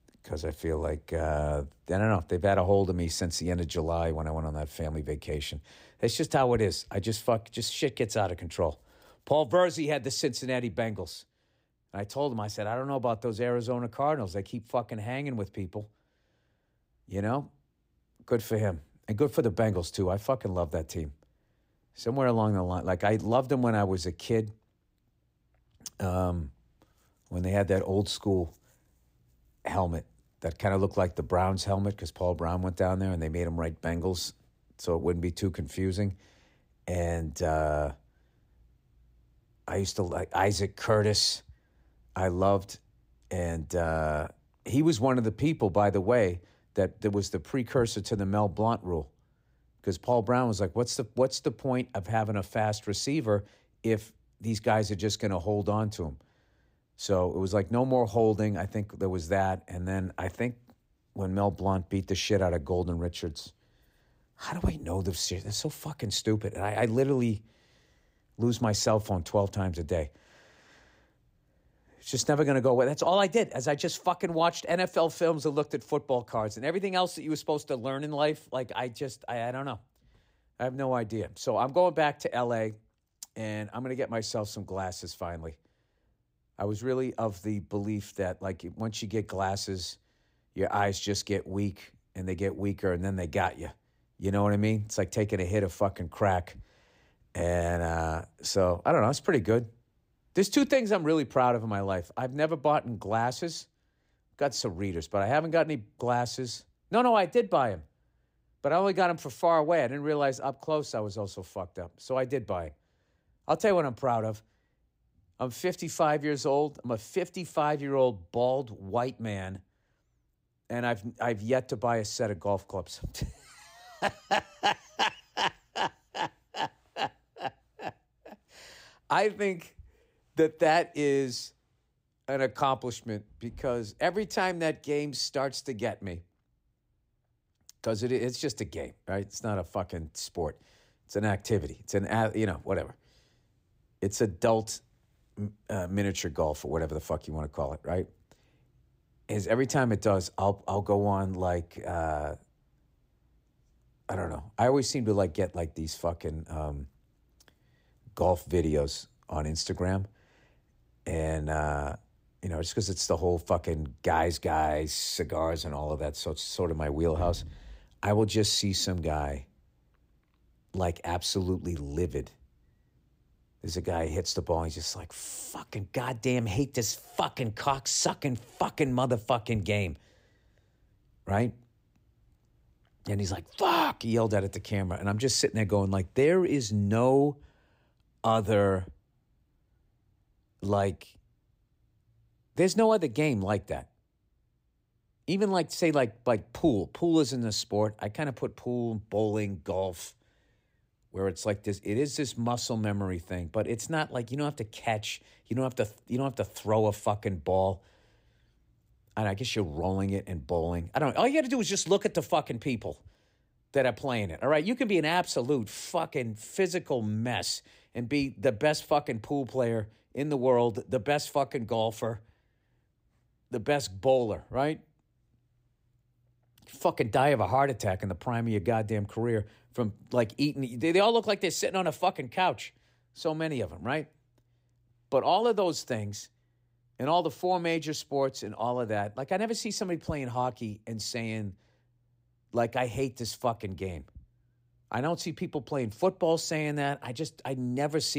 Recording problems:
abrupt cut into speech; at the end

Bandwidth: 15.5 kHz